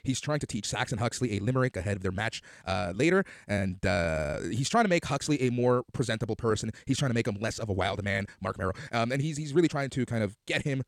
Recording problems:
wrong speed, natural pitch; too fast; 1.5 times normal speed

